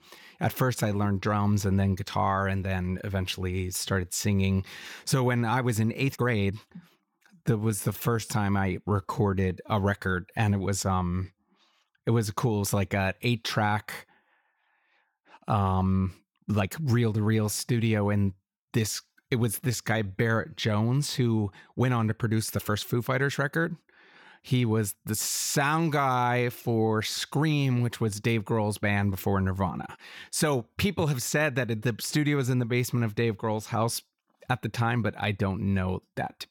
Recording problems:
uneven, jittery; strongly; from 6 to 23 s

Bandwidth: 17.5 kHz